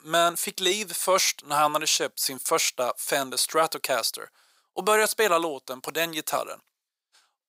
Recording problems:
thin; very; fading below 500 Hz

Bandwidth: 15.5 kHz